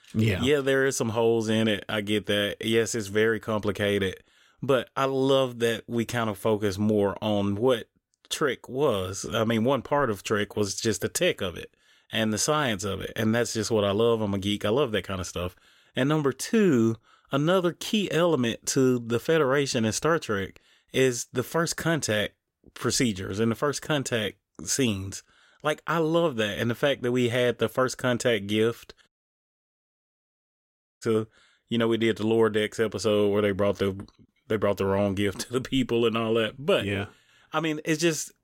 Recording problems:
audio cutting out; at 29 s for 2 s

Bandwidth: 16 kHz